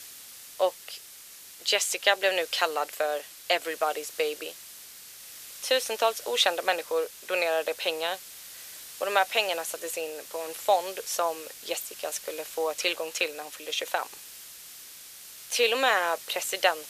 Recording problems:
thin; very; fading below 500 Hz
hiss; noticeable; throughout; 15 dB below the speech

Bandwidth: 14.5 kHz